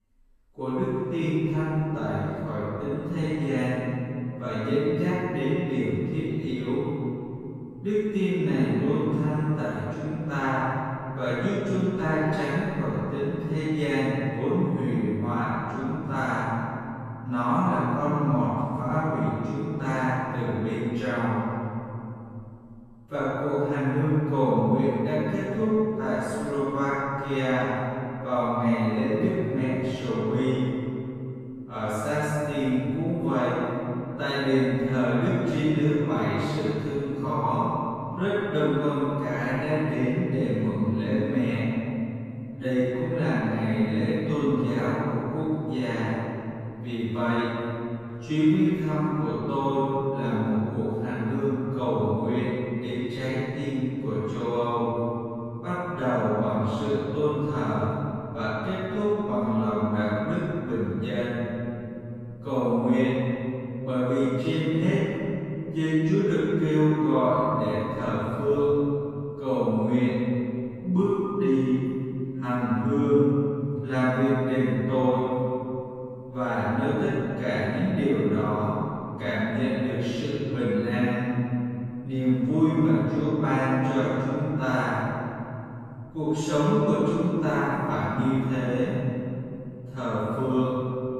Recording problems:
room echo; strong; dies away in 2.9 s
off-mic speech; far
wrong speed, natural pitch; too slow; 0.6 times normal speed

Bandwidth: 15 kHz